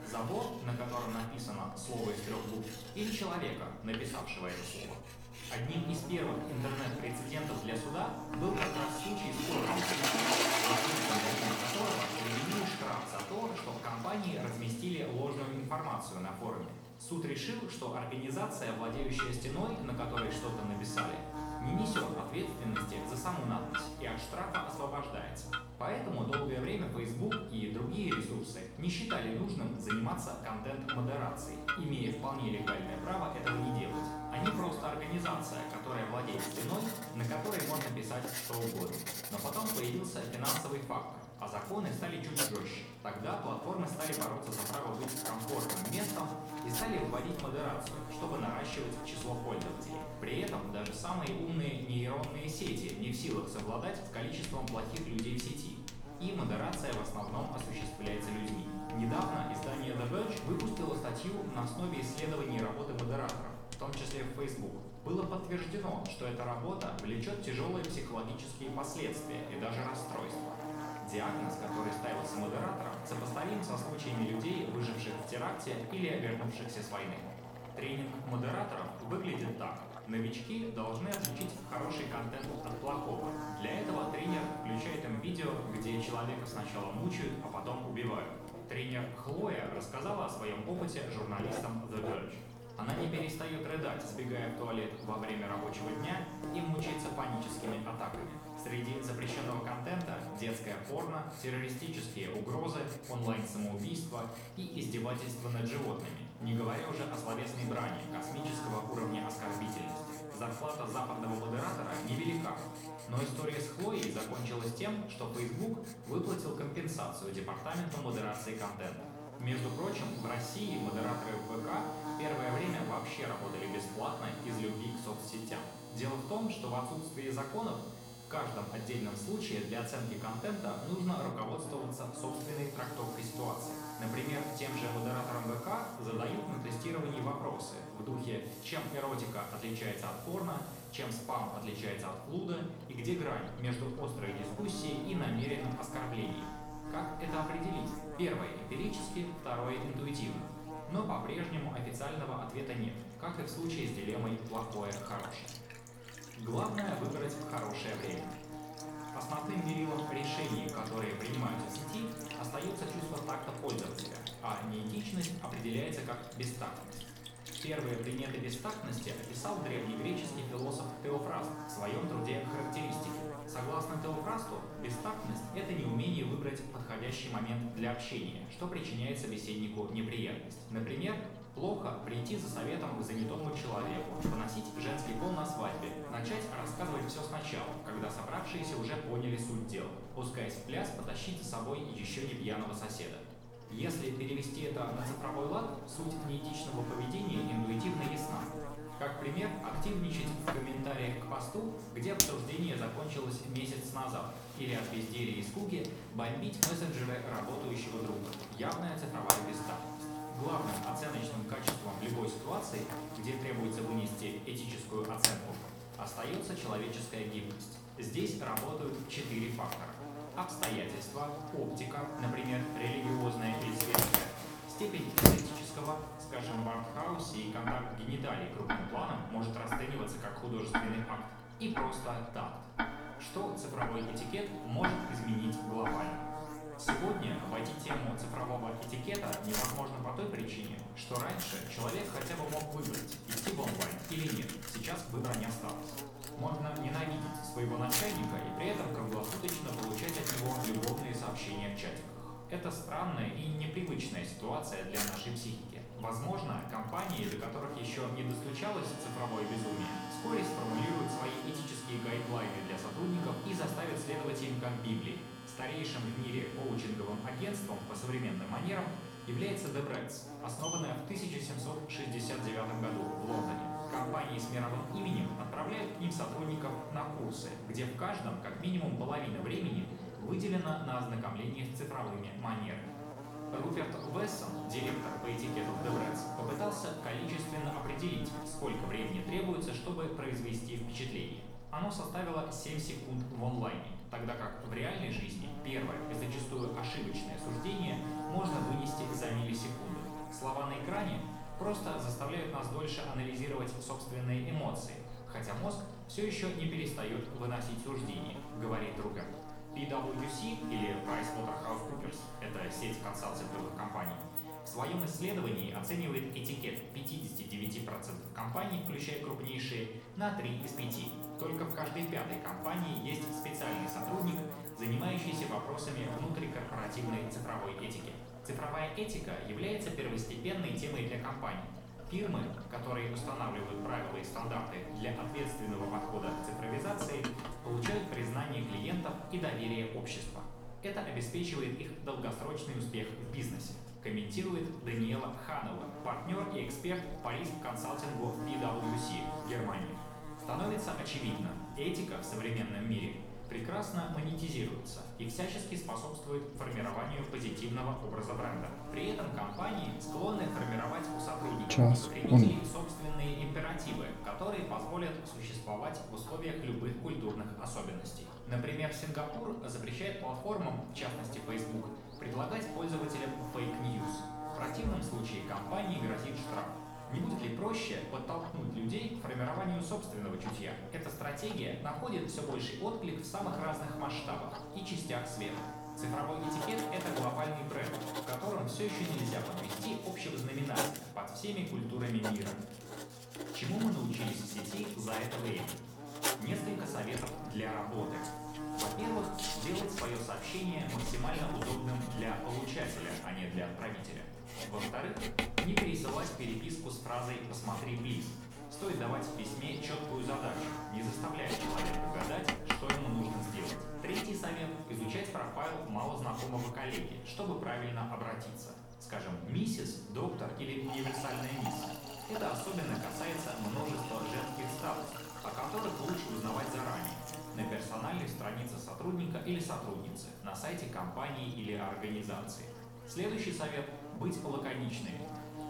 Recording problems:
off-mic speech; far
room echo; noticeable; dies away in 0.7 s
electrical hum; loud; throughout; 60 Hz, 7 dB below the speech
household noises; loud; throughout; 3 dB below the speech
uneven, jittery; strongly; from 2:05 to 7:13

